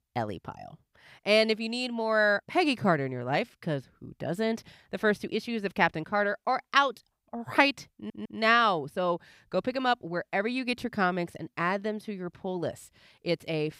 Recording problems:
audio stuttering; at 8 s

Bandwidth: 15.5 kHz